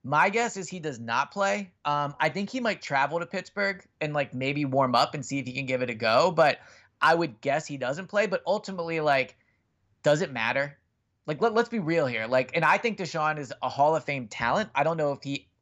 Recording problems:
none

